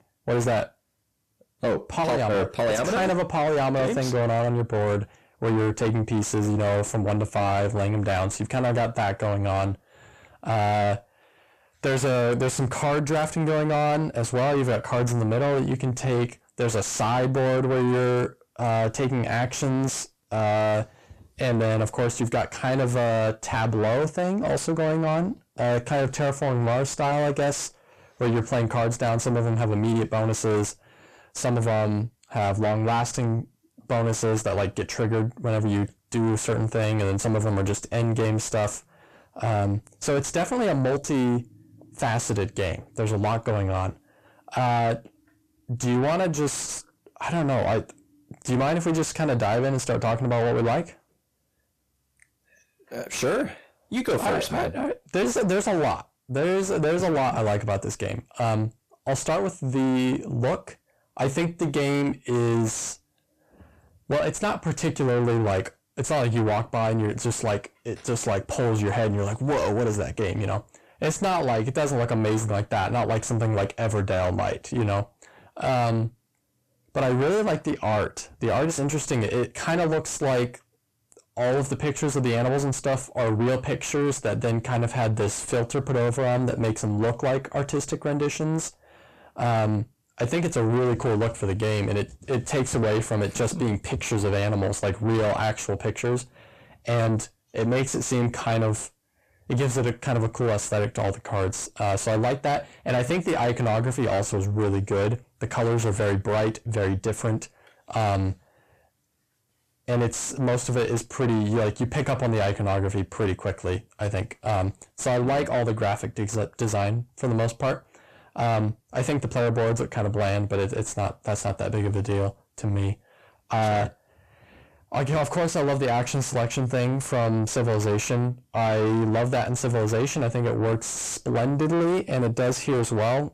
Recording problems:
distortion; heavy; 6 dB below the speech

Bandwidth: 14.5 kHz